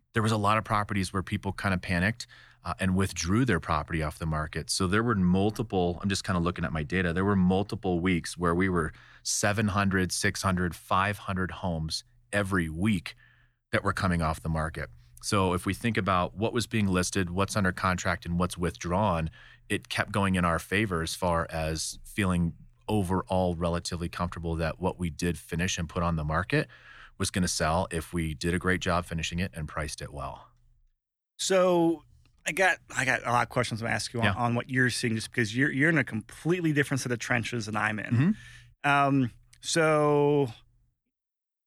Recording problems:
none

